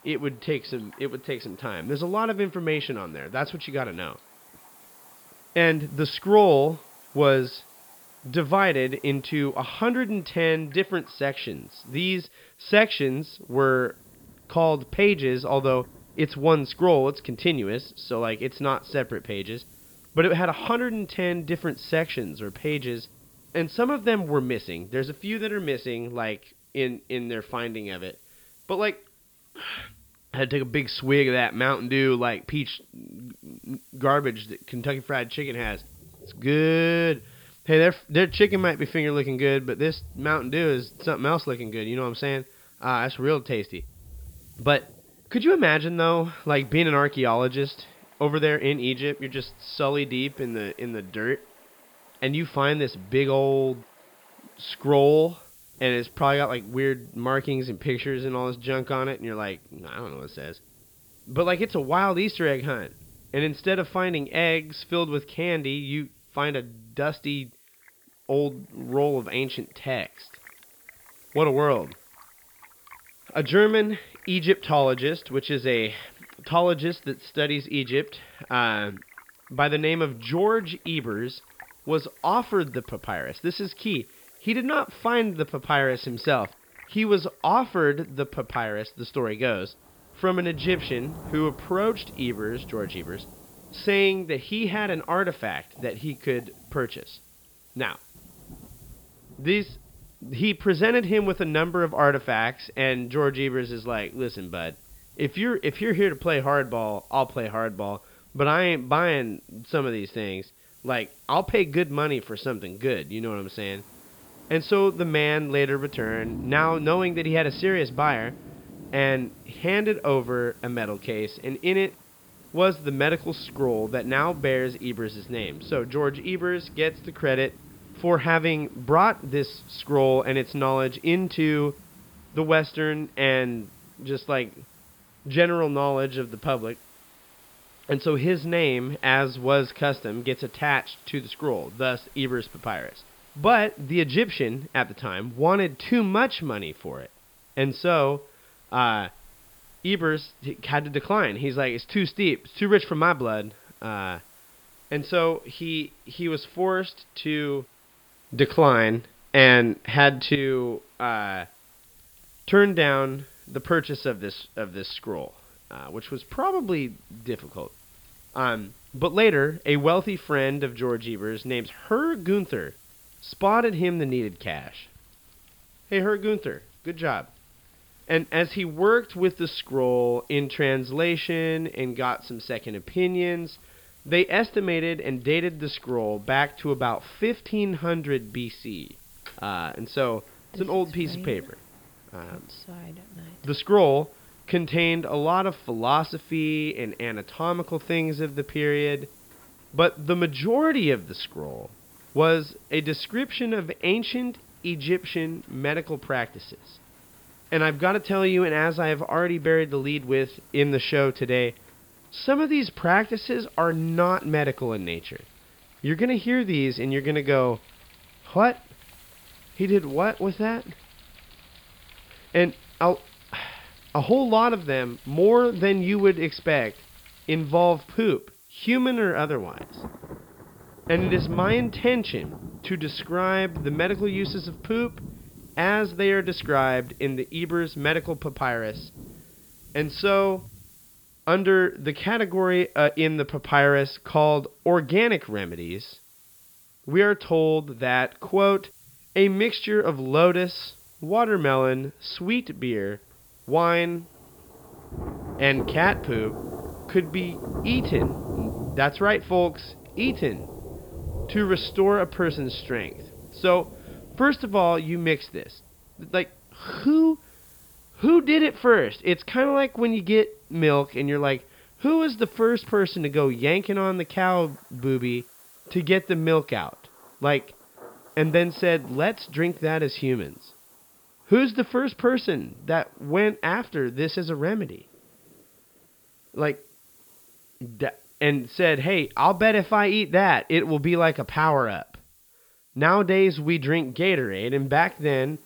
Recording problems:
high frequencies cut off; noticeable; nothing above 5.5 kHz
rain or running water; noticeable; throughout; 20 dB below the speech
hiss; faint; throughout; 30 dB below the speech

